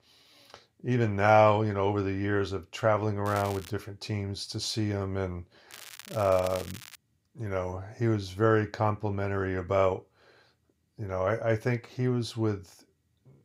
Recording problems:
crackling; noticeable; at 3.5 s and from 5.5 to 7 s; 15 dB below the speech

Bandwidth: 15.5 kHz